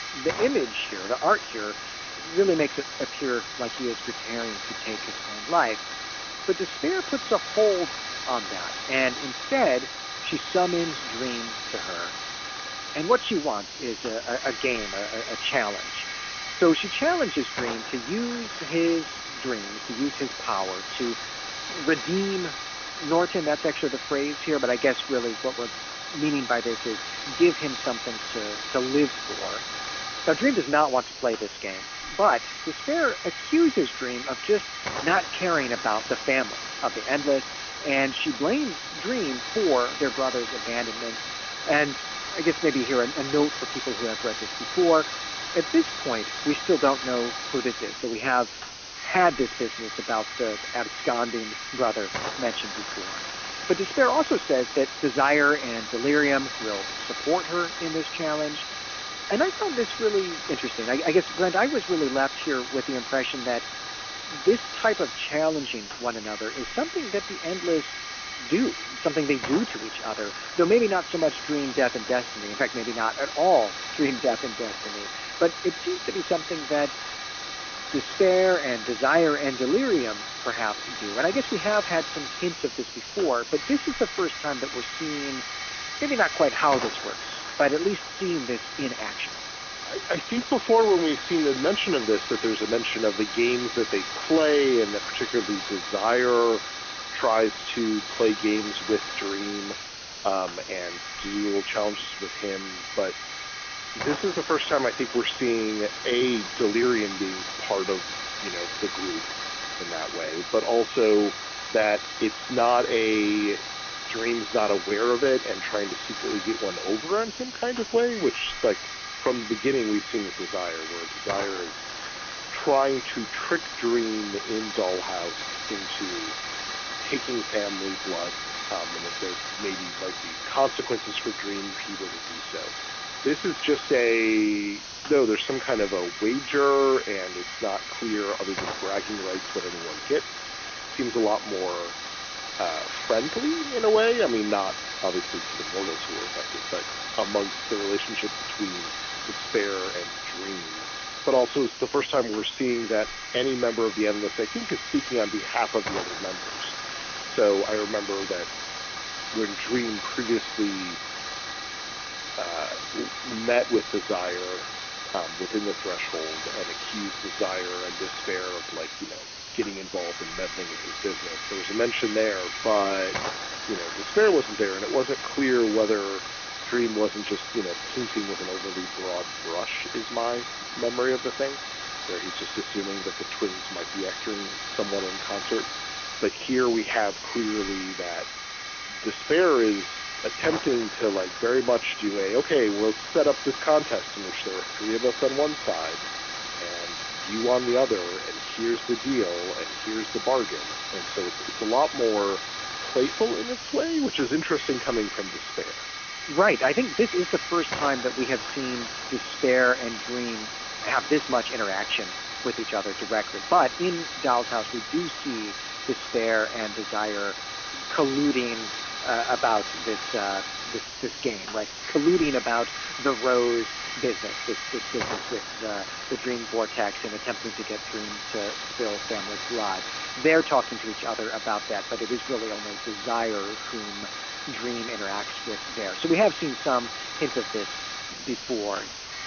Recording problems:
phone-call audio; poor line; nothing above 3.5 kHz
hiss; loud; throughout; 6 dB below the speech

